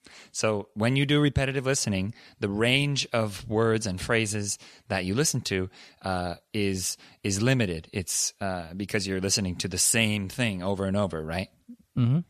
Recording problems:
none

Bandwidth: 14 kHz